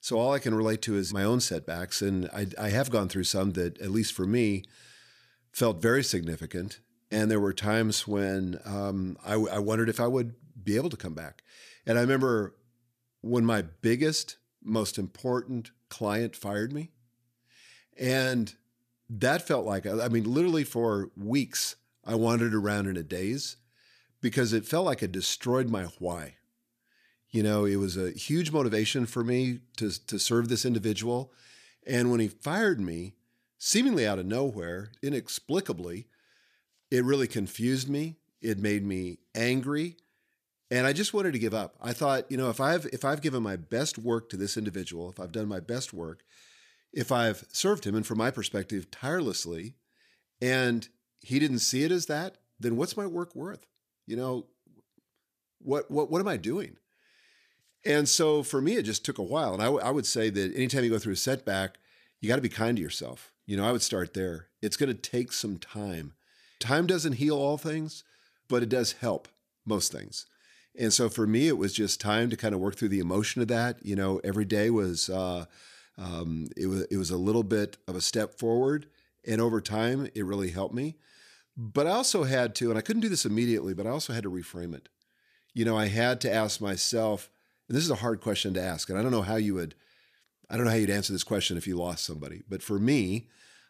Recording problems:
none

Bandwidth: 14.5 kHz